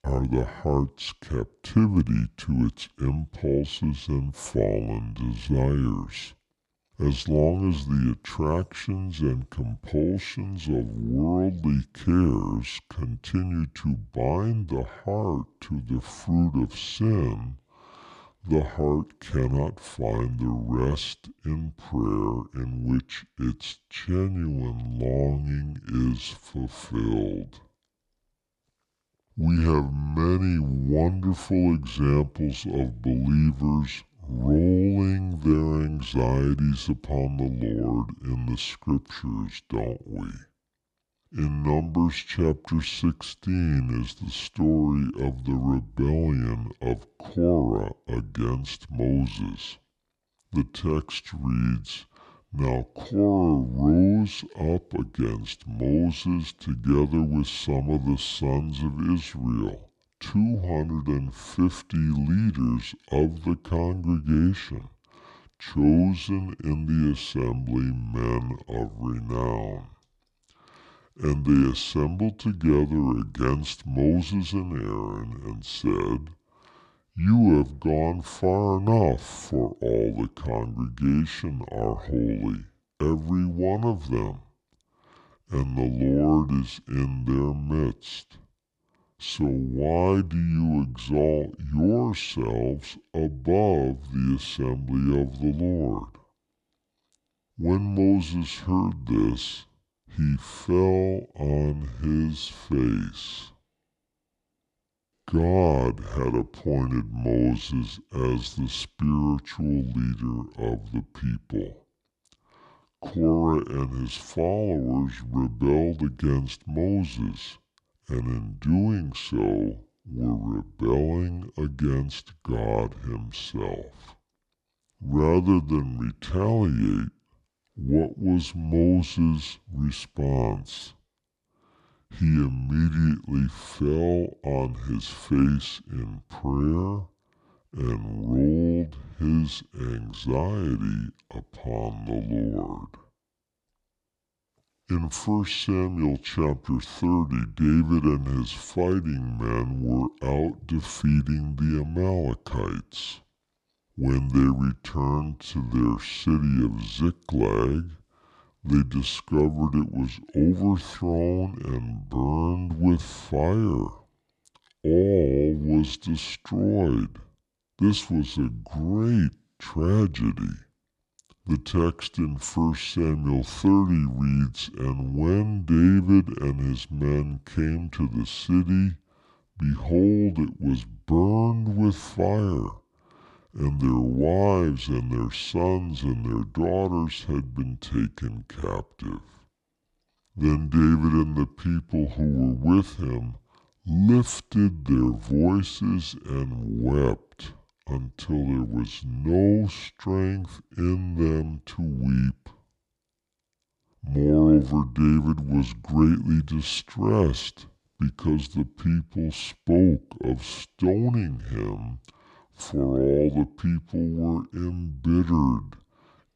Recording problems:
wrong speed and pitch; too slow and too low; 0.7 times normal speed

